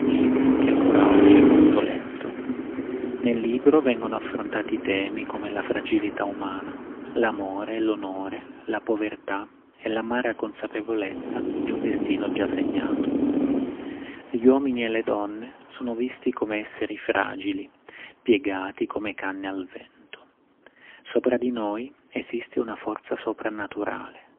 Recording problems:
phone-call audio; poor line; nothing above 3 kHz
traffic noise; very loud; throughout; 4 dB above the speech

